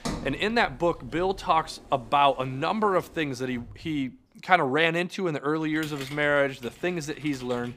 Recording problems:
household noises; noticeable; throughout; 20 dB below the speech

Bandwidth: 15 kHz